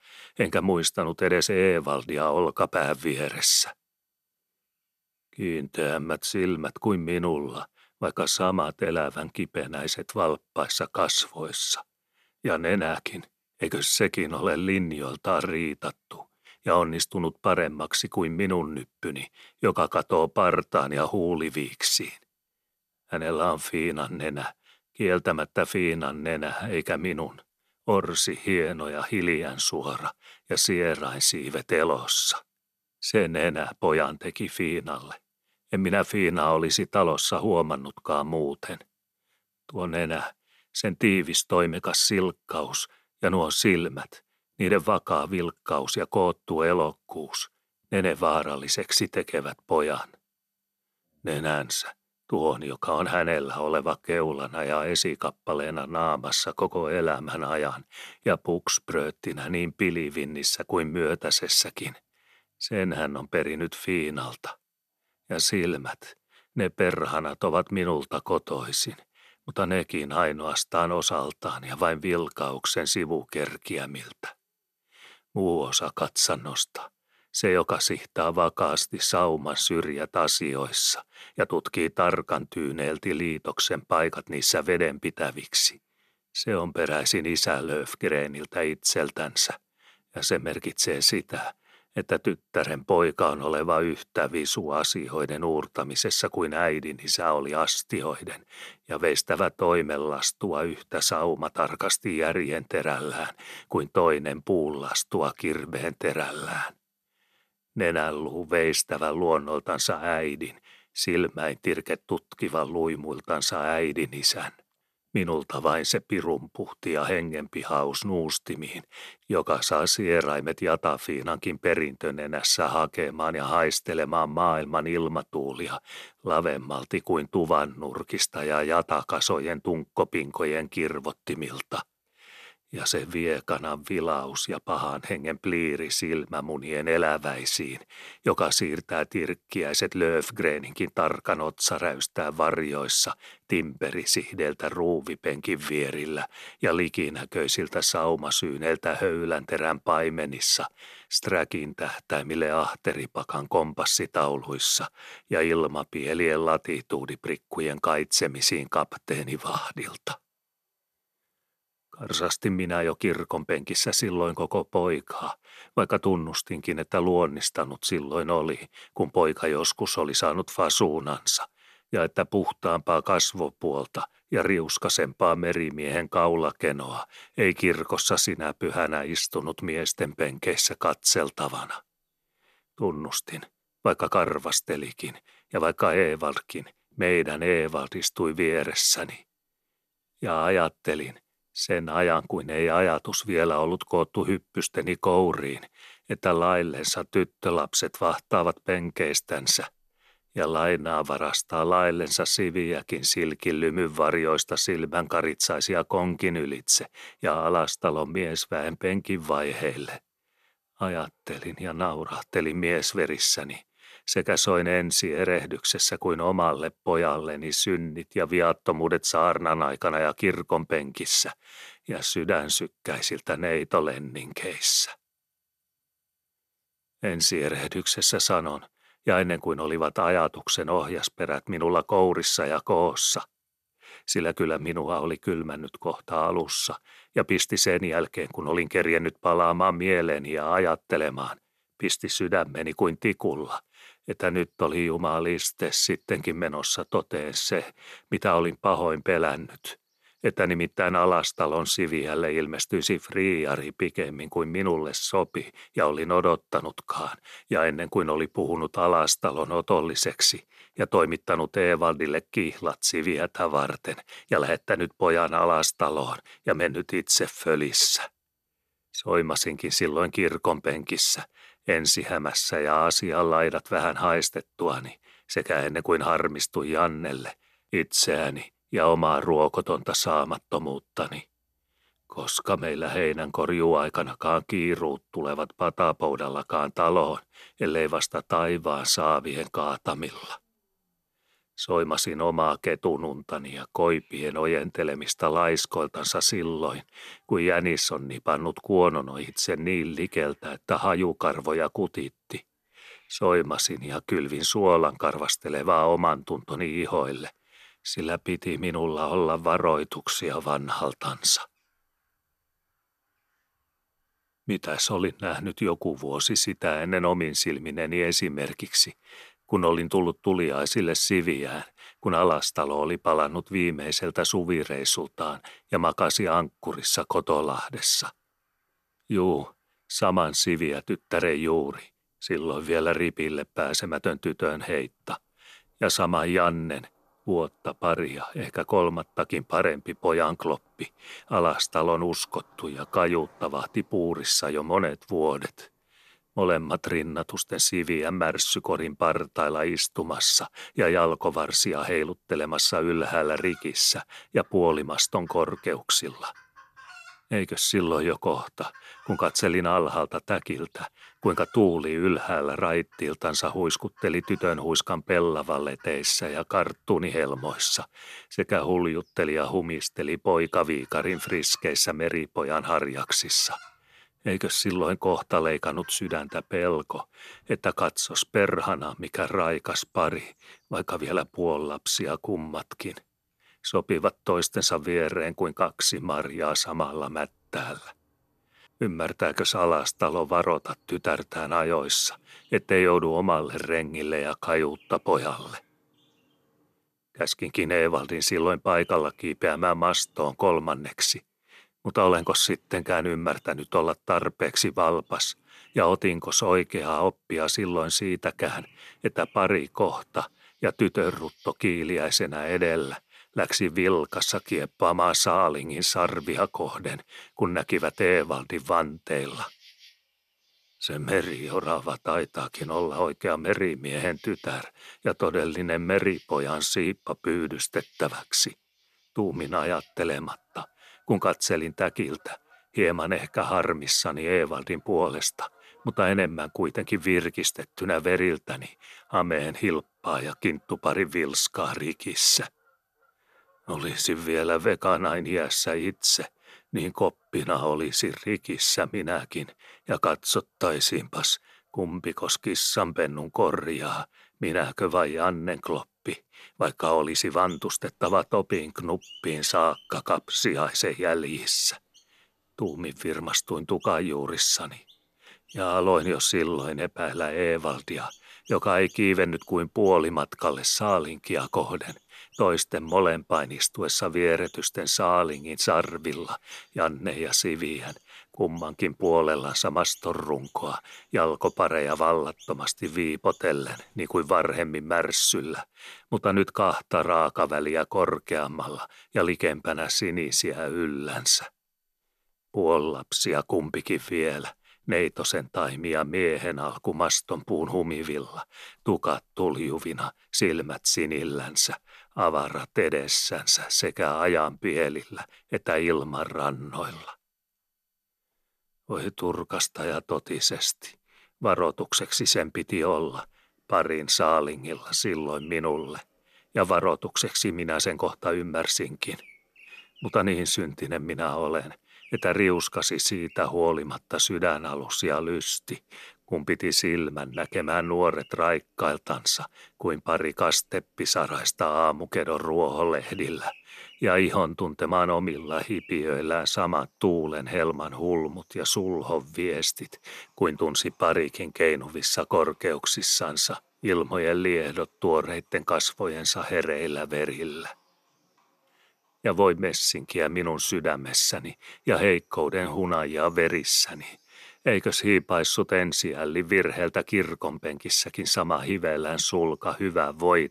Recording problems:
animal sounds; faint; throughout; 30 dB below the speech

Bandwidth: 14 kHz